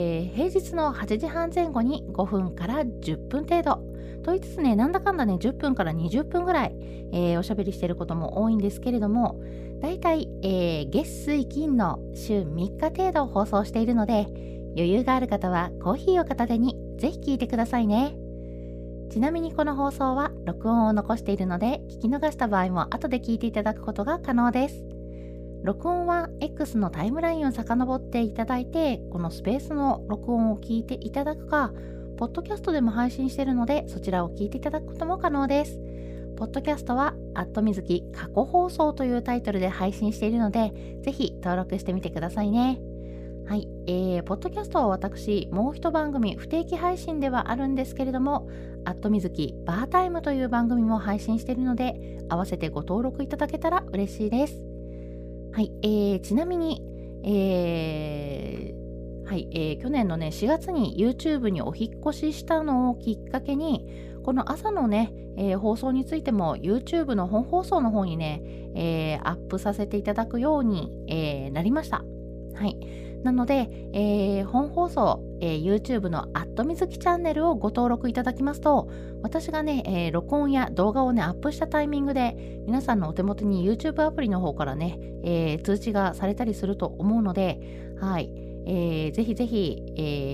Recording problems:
electrical hum; noticeable; throughout; 60 Hz, 15 dB below the speech
abrupt cut into speech; at the start and the end

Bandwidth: 15 kHz